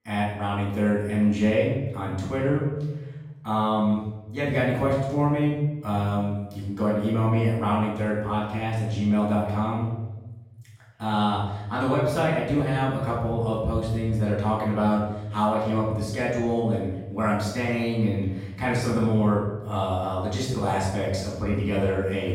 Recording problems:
off-mic speech; far
room echo; noticeable; dies away in 1.2 s

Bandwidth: 16 kHz